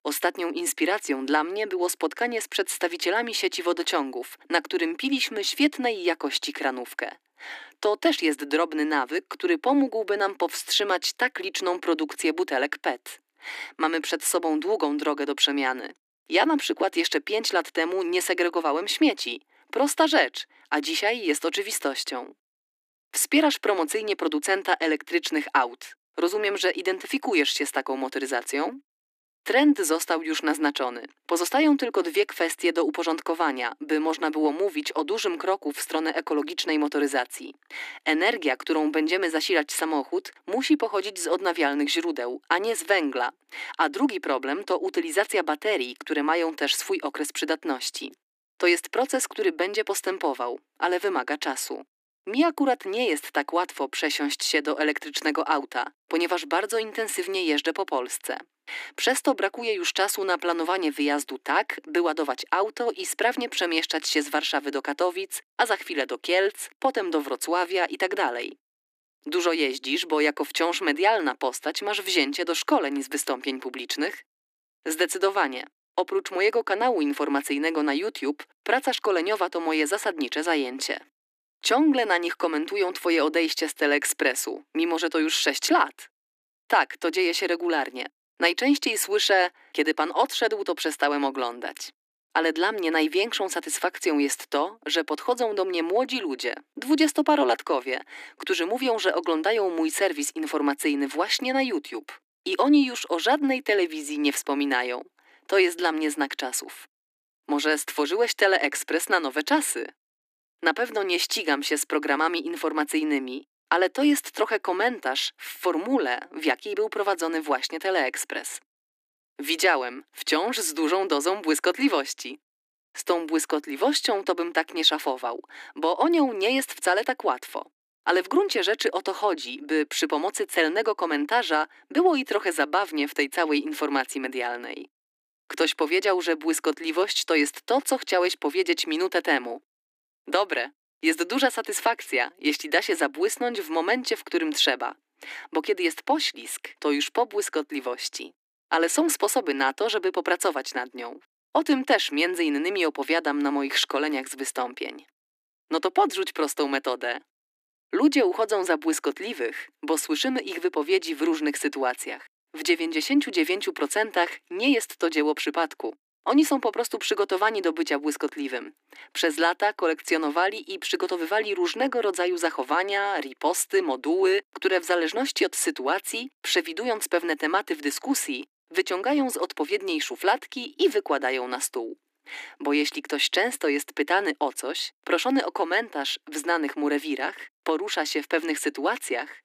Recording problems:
thin; somewhat; fading below 300 Hz

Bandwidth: 14.5 kHz